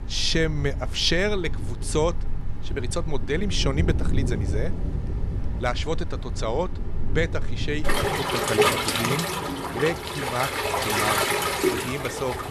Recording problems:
rain or running water; very loud; throughout; 1 dB above the speech

